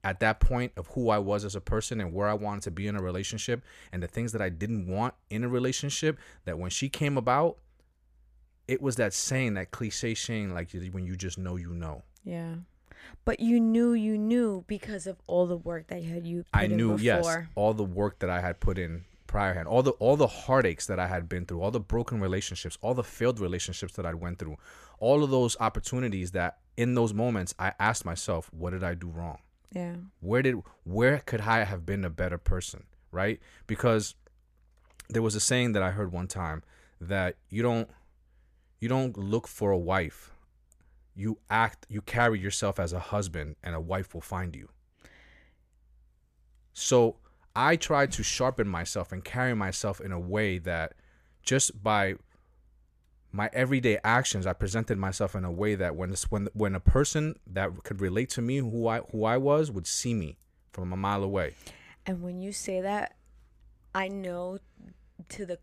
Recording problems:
none

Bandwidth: 14.5 kHz